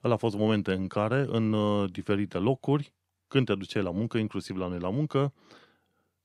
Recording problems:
none

